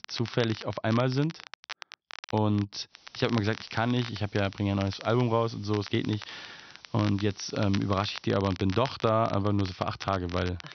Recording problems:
high frequencies cut off; noticeable; nothing above 6 kHz
crackle, like an old record; noticeable; 15 dB below the speech
hiss; faint; from 3 to 8.5 s; 25 dB below the speech

